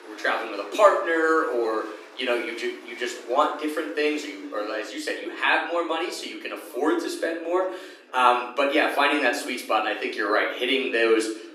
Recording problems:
off-mic speech; far
thin; somewhat; fading below 300 Hz
room echo; slight; dies away in 0.6 s
chatter from many people; faint; throughout; 25 dB below the speech

